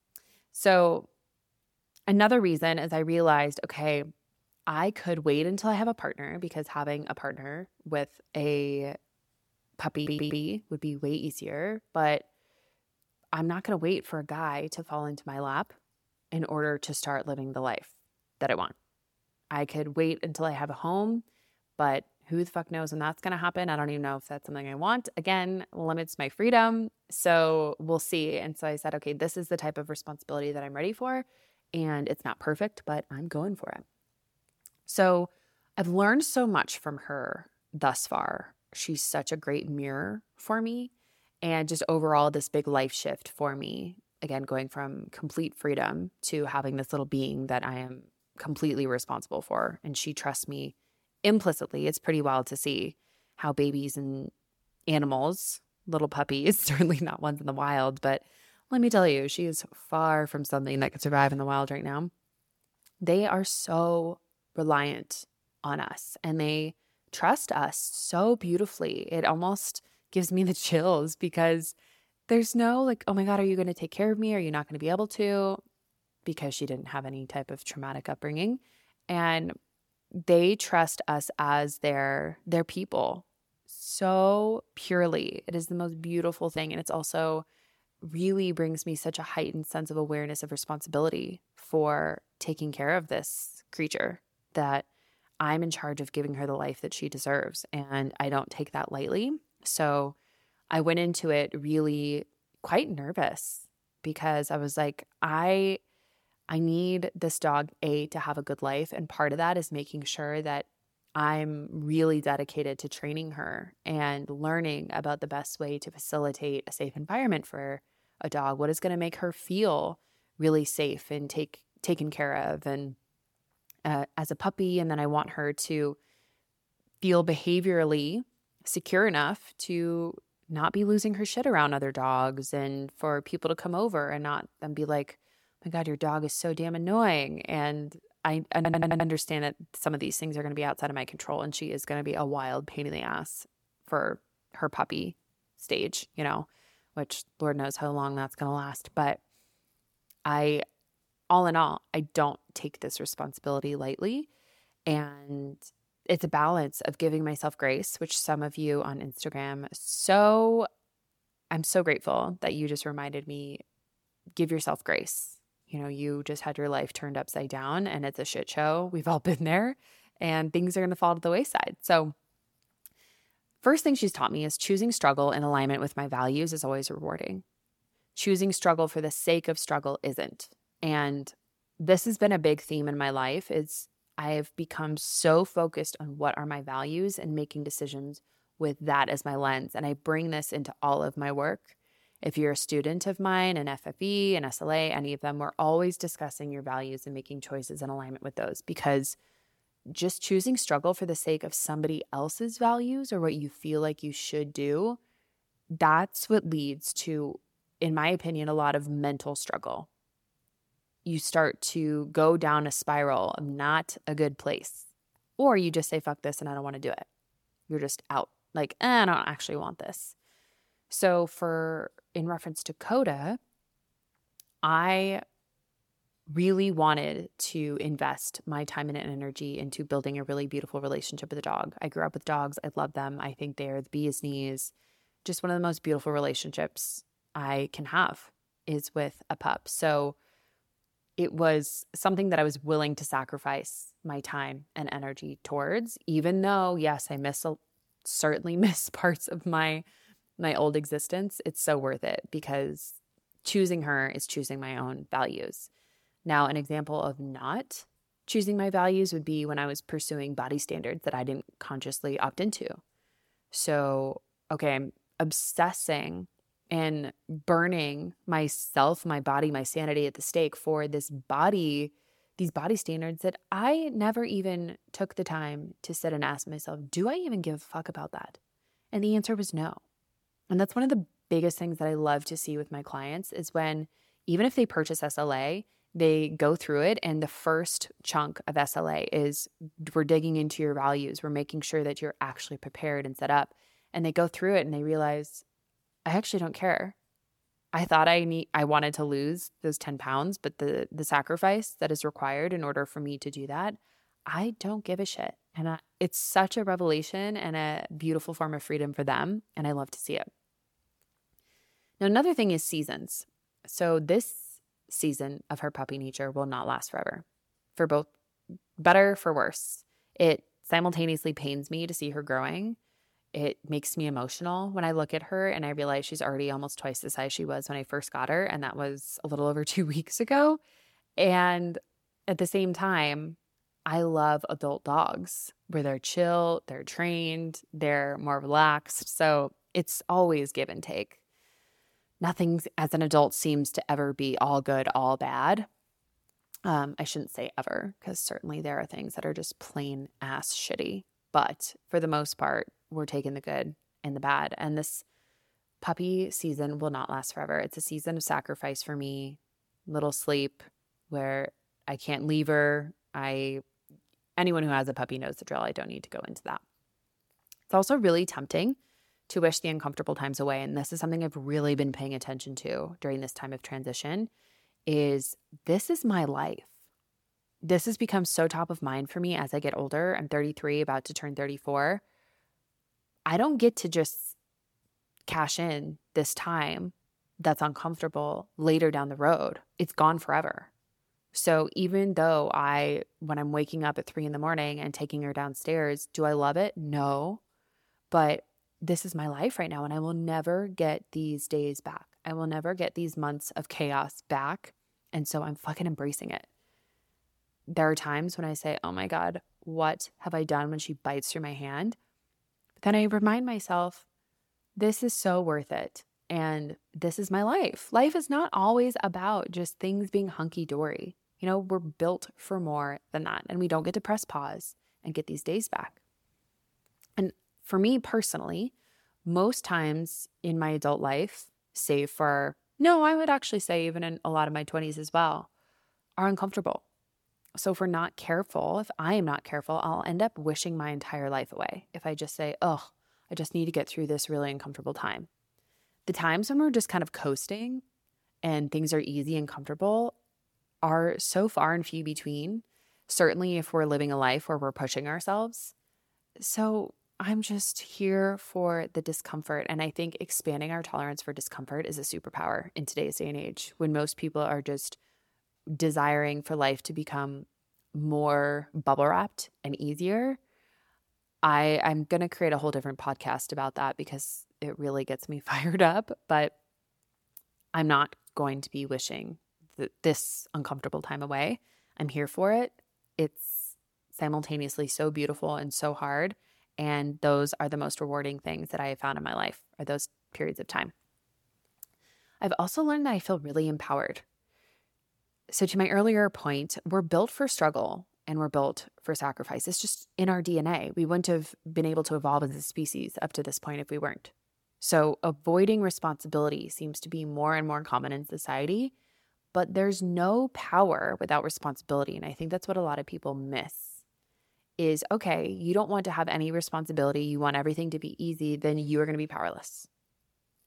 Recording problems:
audio stuttering; at 10 s and at 2:19

